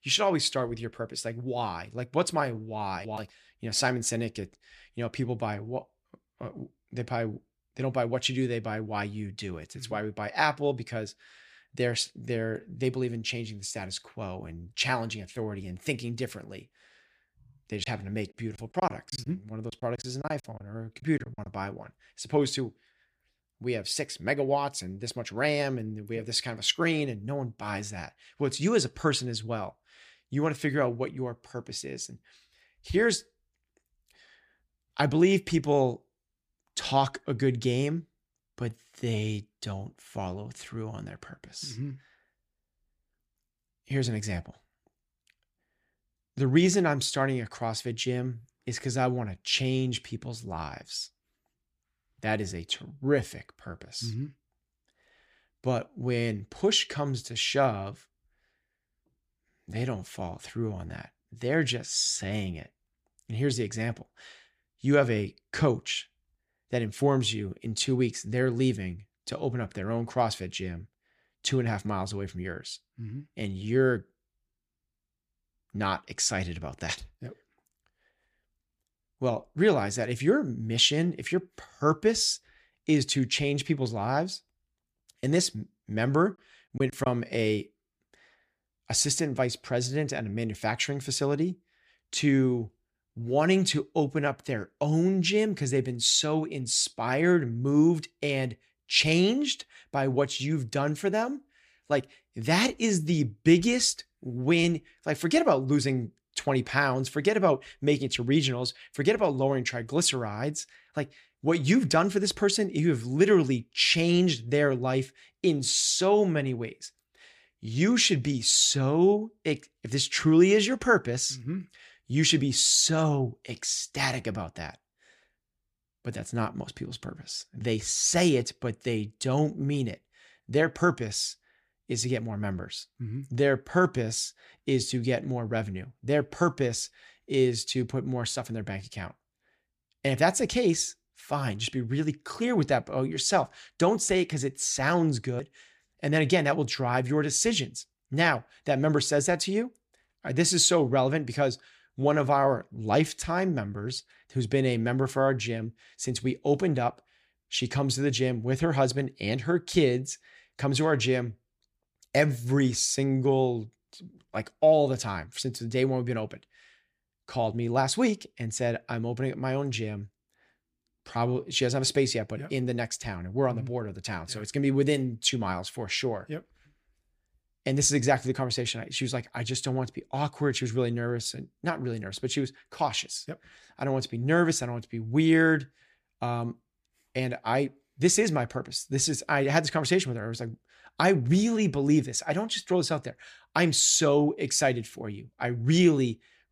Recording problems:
choppy; very; from 18 to 21 s and at 1:27; 13% of the speech affected

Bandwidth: 15 kHz